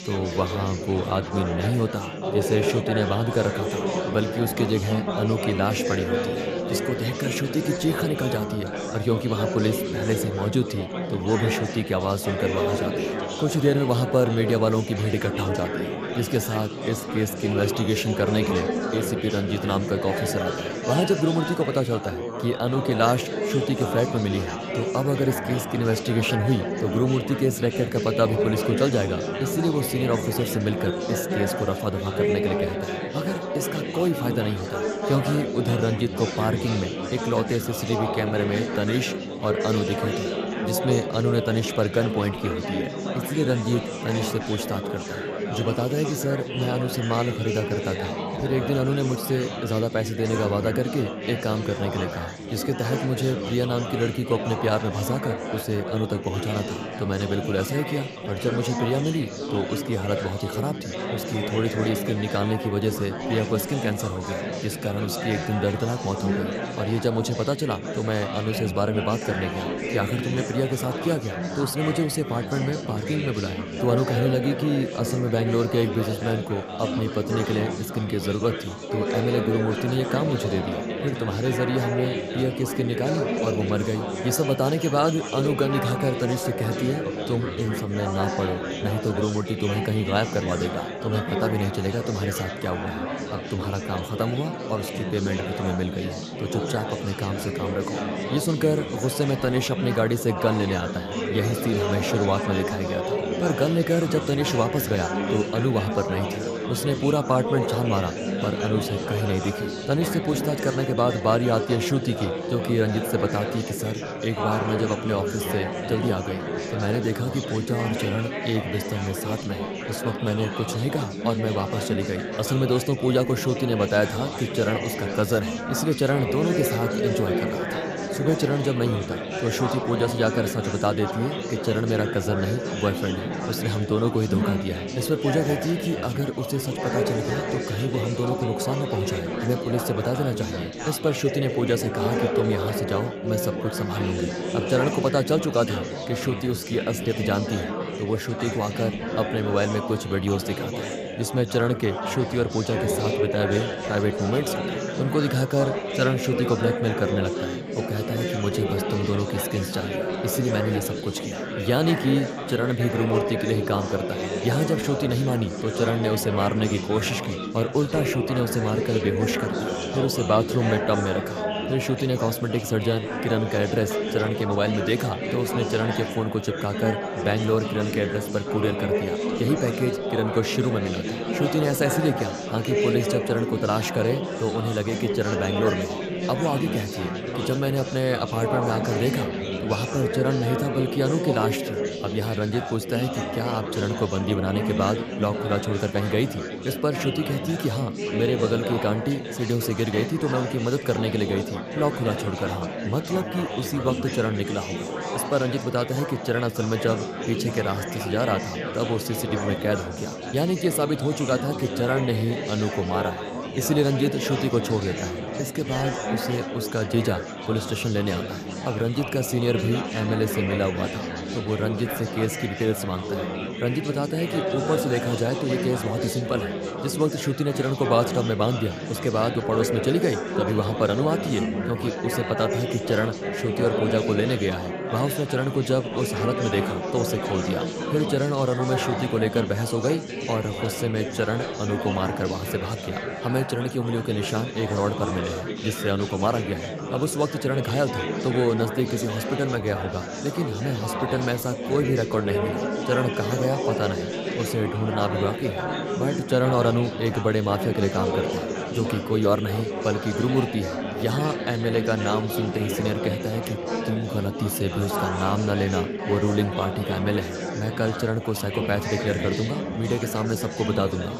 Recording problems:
chatter from many people; loud; throughout; 3 dB below the speech

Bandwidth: 14.5 kHz